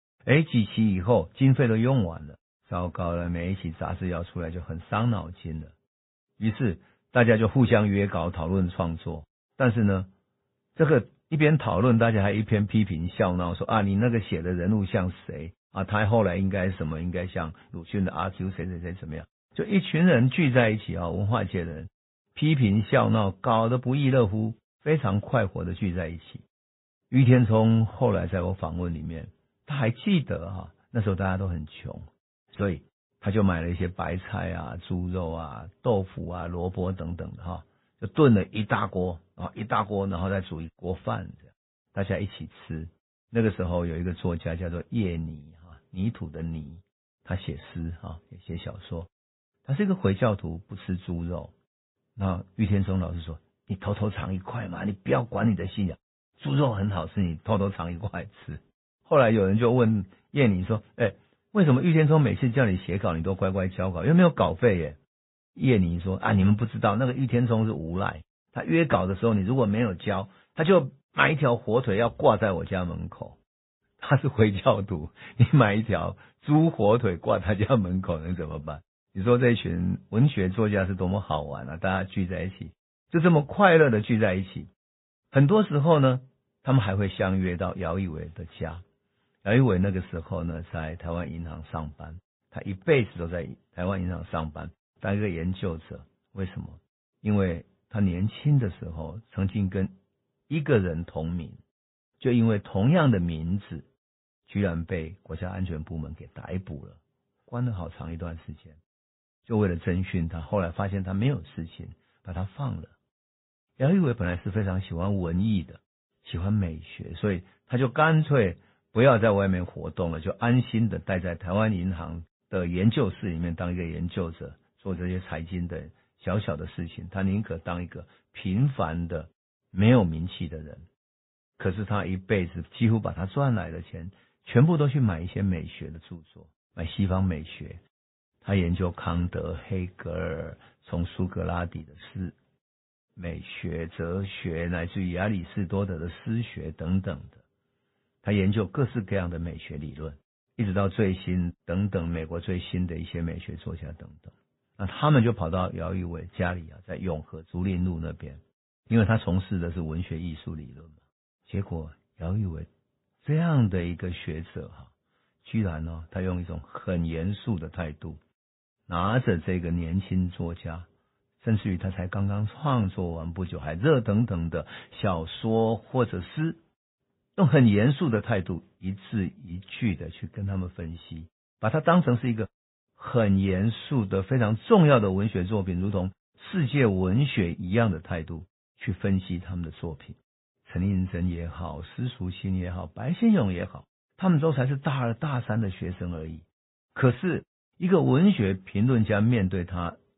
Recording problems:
high frequencies cut off; severe; nothing above 4 kHz
garbled, watery; slightly

